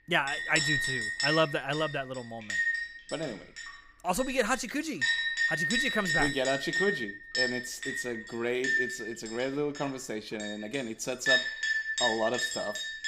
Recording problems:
household noises; very loud; throughout; 3 dB above the speech

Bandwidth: 15.5 kHz